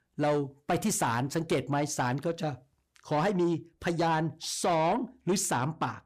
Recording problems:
distortion; slight; 10 dB below the speech

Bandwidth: 15 kHz